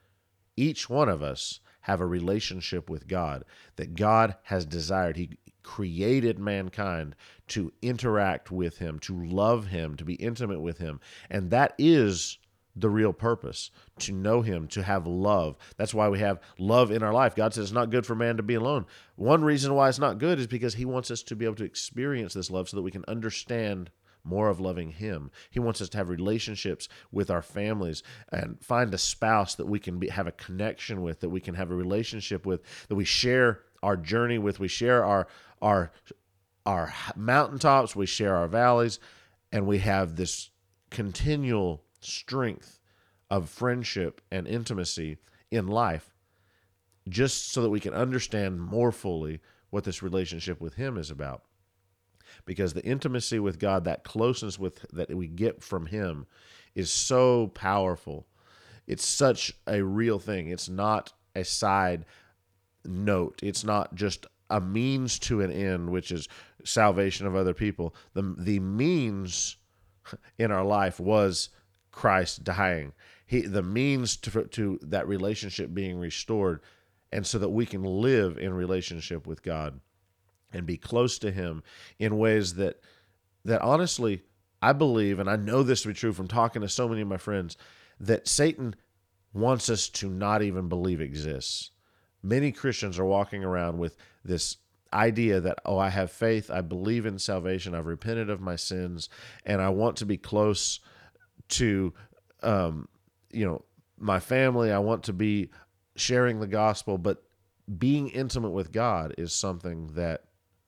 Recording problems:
none

